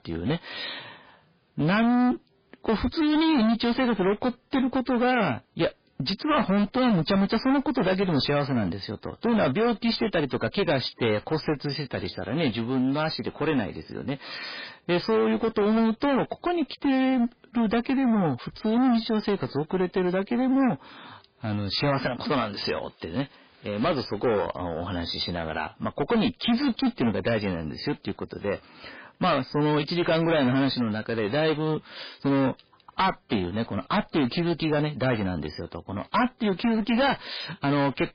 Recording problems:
distortion; heavy; 17% of the sound clipped
garbled, watery; badly; nothing above 5 kHz

